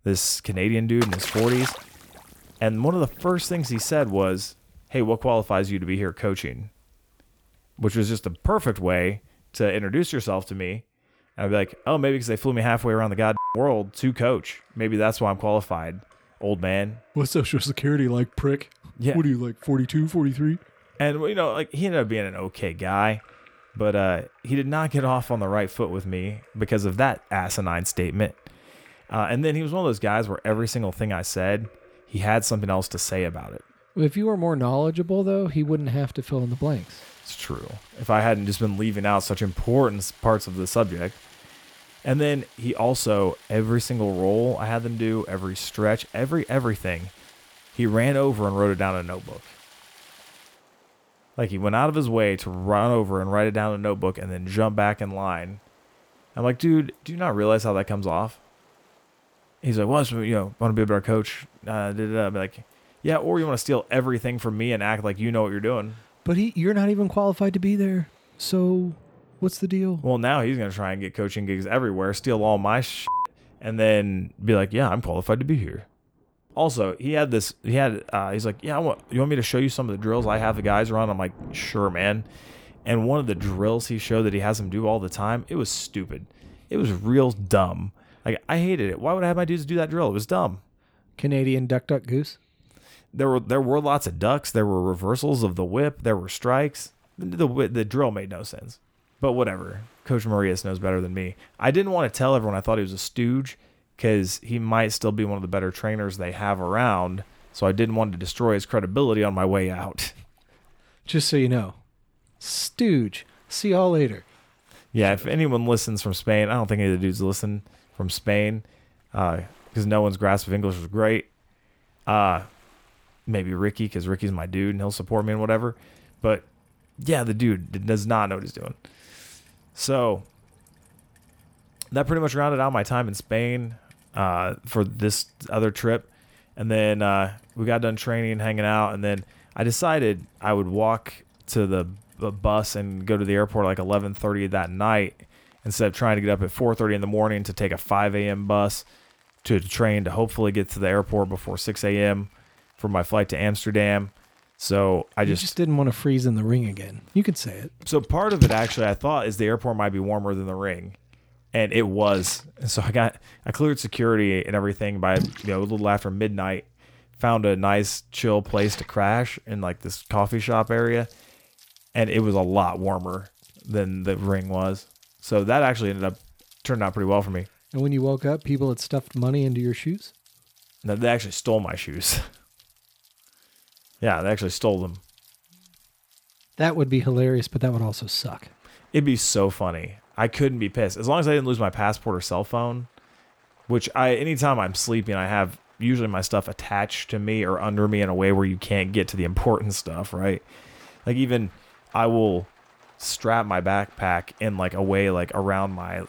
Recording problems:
rain or running water; noticeable; throughout; 15 dB below the speech

